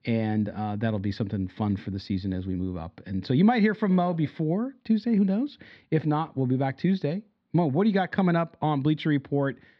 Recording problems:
muffled; very slightly; fading above 4 kHz

